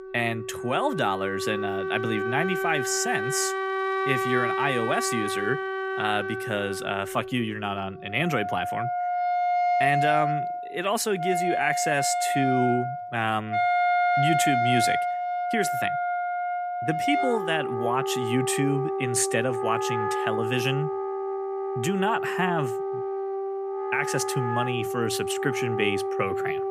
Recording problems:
background music; very loud; throughout; as loud as the speech

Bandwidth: 15 kHz